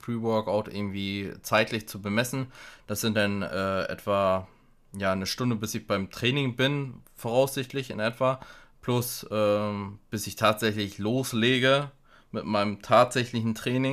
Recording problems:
abrupt cut into speech; at the end

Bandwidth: 14.5 kHz